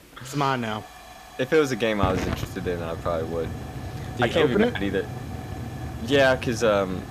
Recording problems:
hiss; noticeable; throughout; 10 dB below the speech

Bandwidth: 14.5 kHz